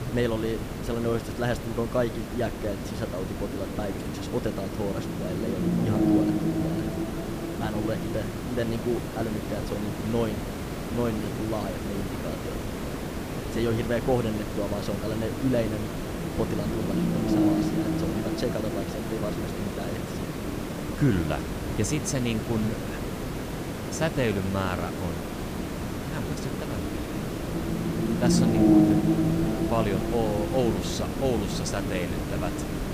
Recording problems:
hiss; loud; throughout; 3 dB below the speech
low rumble; loud; throughout; 1 dB below the speech

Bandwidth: 15 kHz